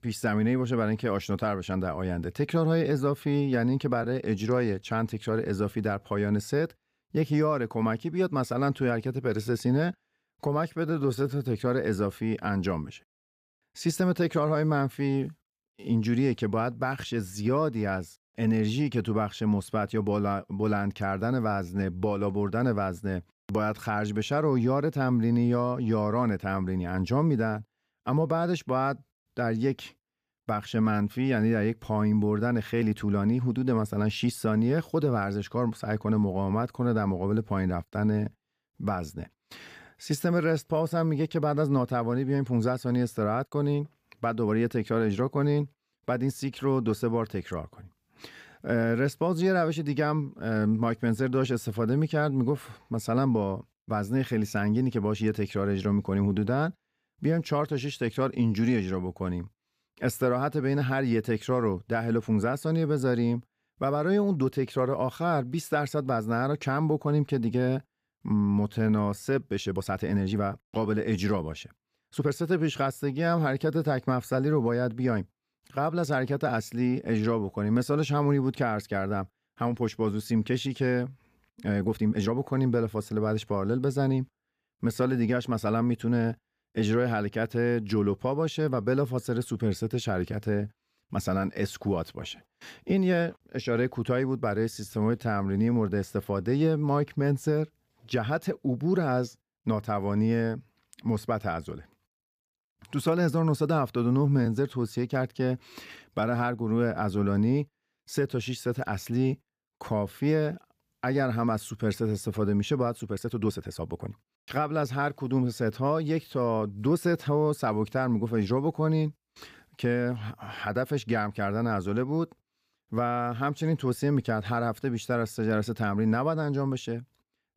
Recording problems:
uneven, jittery; strongly; from 4 s to 1:54

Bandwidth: 15 kHz